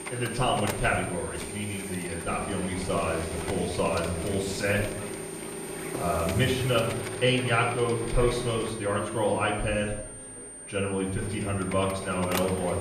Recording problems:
off-mic speech; far
room echo; noticeable; dies away in 0.6 s
household noises; loud; throughout; 8 dB below the speech
high-pitched whine; noticeable; throughout; 9 kHz, 10 dB below the speech
background chatter; faint; throughout; 4 voices, 25 dB below the speech

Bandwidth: 14.5 kHz